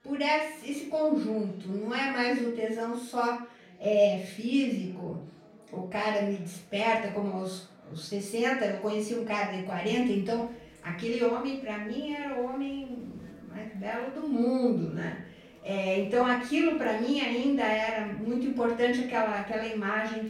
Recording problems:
off-mic speech; far
room echo; noticeable; dies away in 0.5 s
murmuring crowd; faint; throughout; 25 dB below the speech

